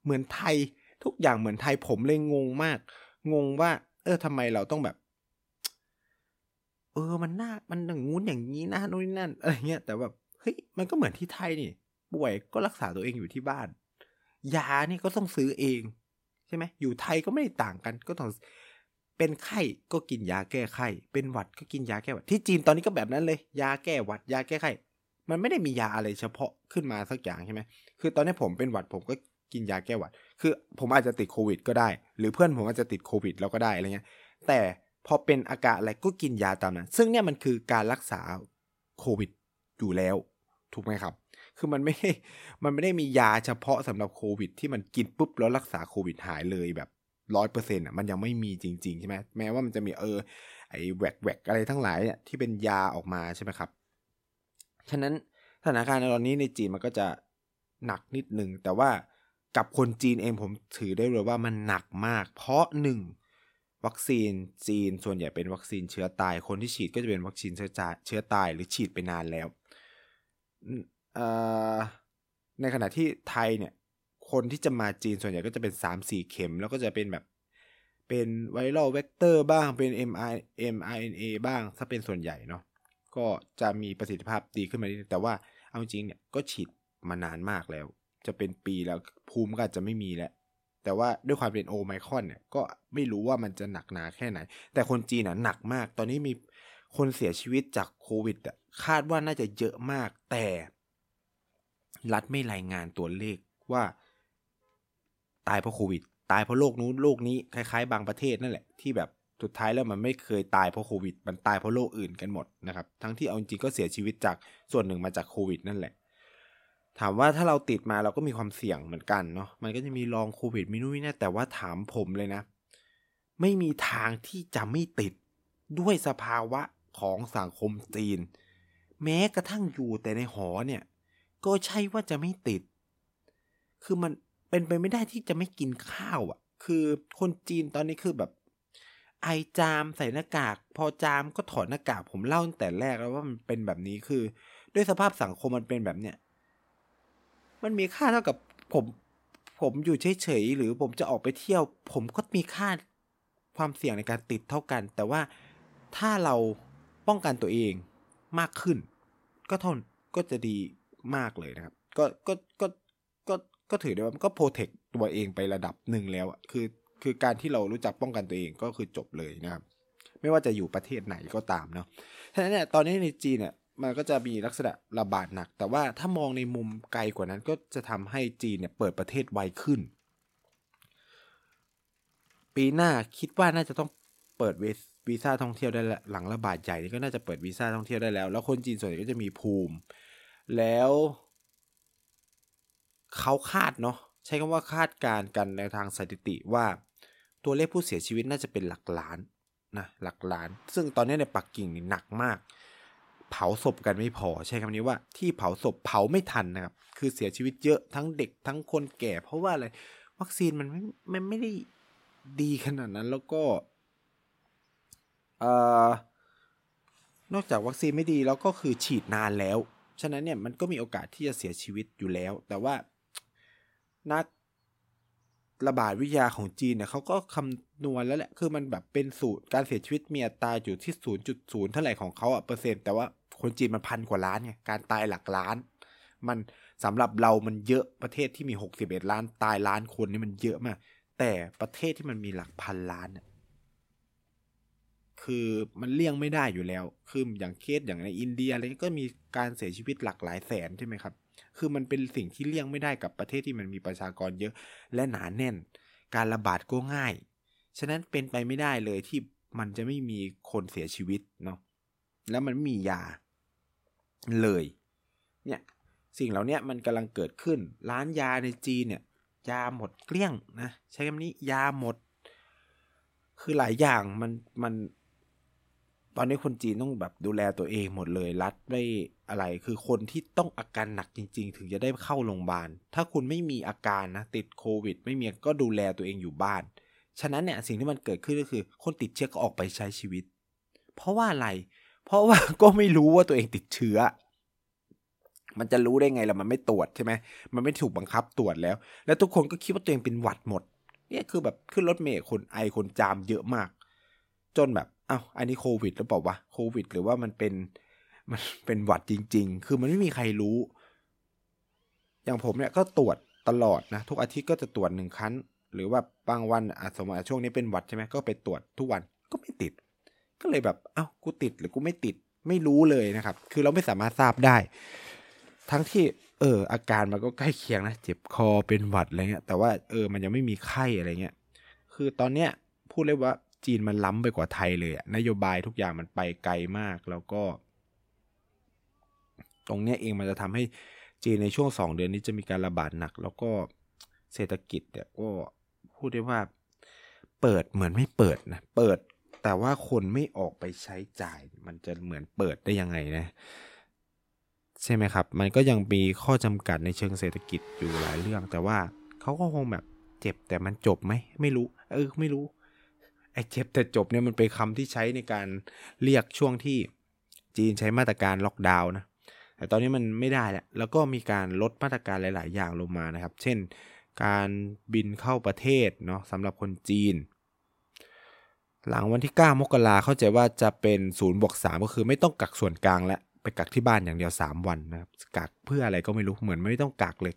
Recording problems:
traffic noise; faint; throughout; 25 dB below the speech

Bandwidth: 16 kHz